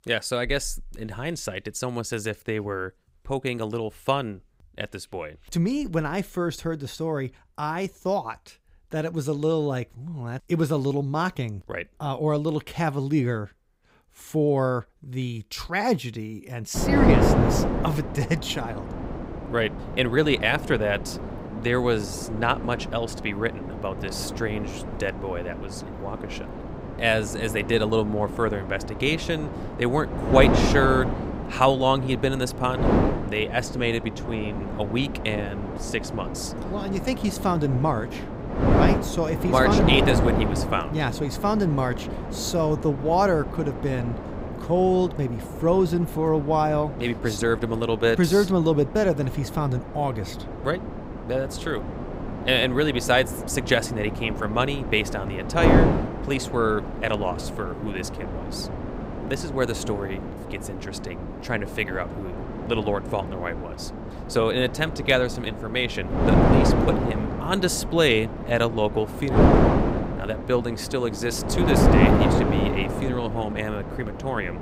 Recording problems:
wind noise on the microphone; heavy; from 17 s on; 4 dB below the speech

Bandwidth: 15.5 kHz